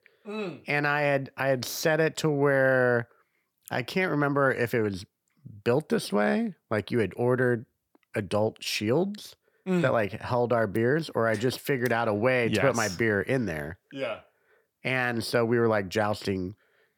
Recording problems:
none

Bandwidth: 18 kHz